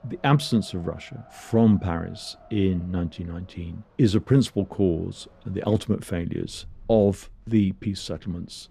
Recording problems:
wind in the background; faint; throughout; 25 dB below the speech

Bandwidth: 14.5 kHz